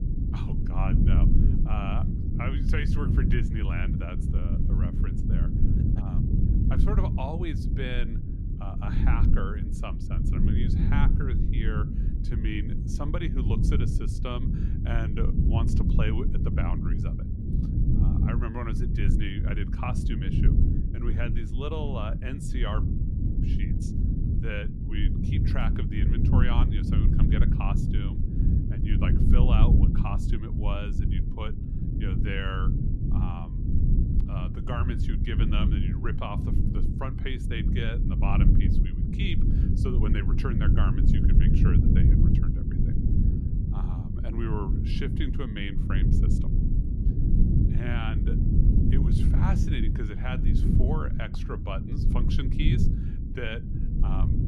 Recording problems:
low rumble; loud; throughout; 1 dB below the speech

